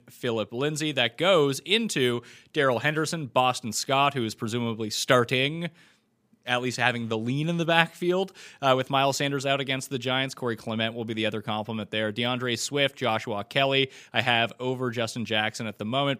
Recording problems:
none

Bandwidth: 15 kHz